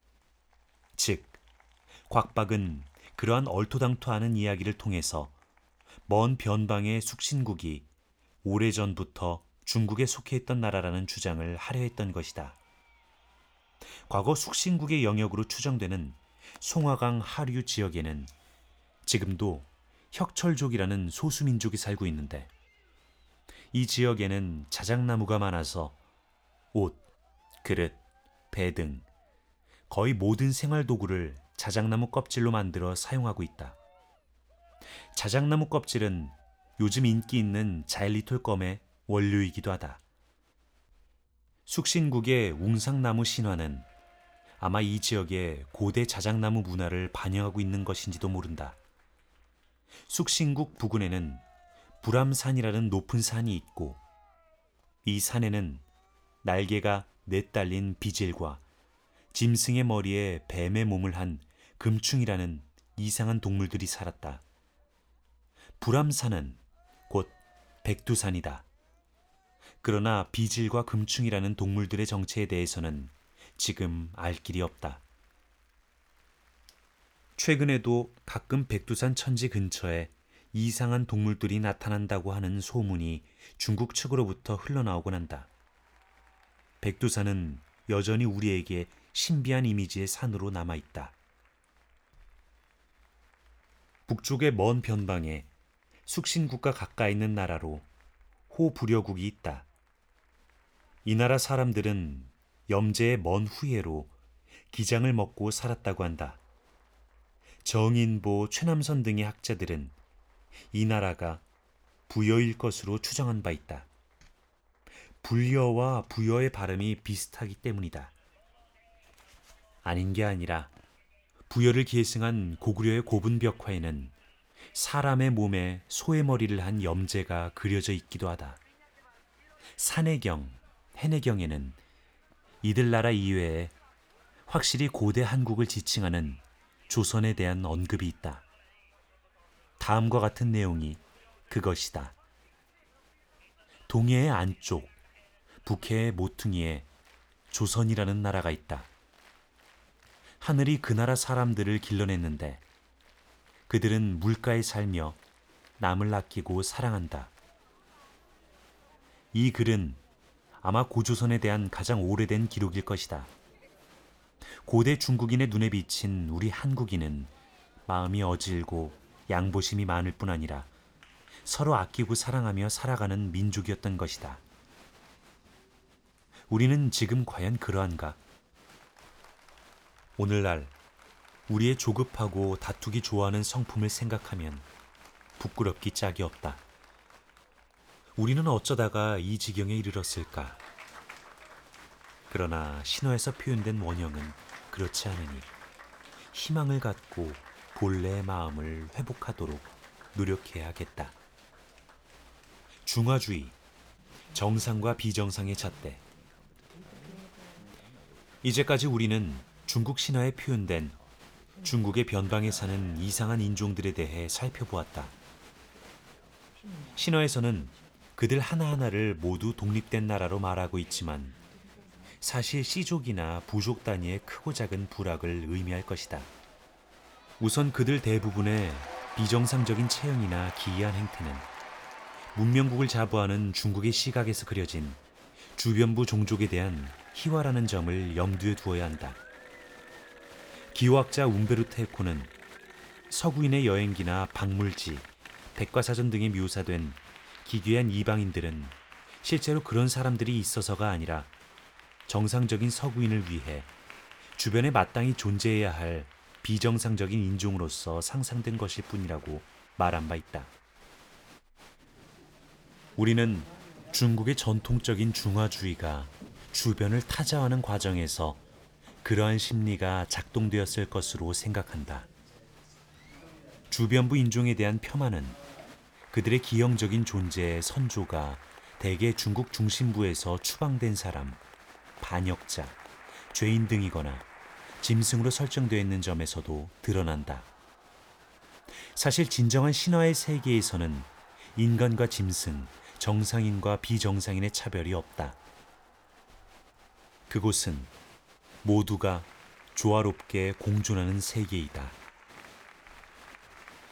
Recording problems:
crowd noise; faint; throughout; 25 dB below the speech

